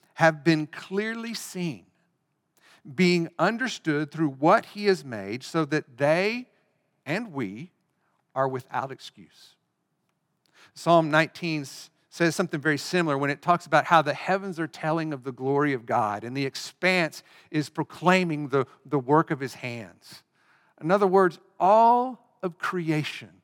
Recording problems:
none

